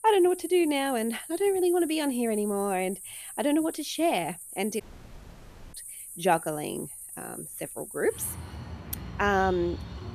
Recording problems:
animal sounds; noticeable; throughout; 10 dB below the speech
audio cutting out; at 5 s for 1 s

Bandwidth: 14.5 kHz